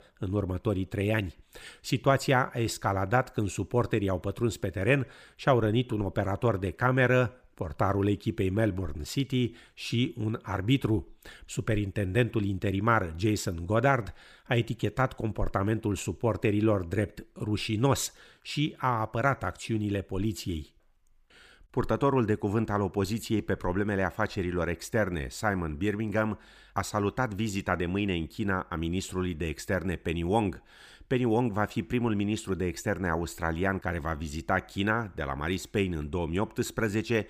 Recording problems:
none

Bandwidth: 15 kHz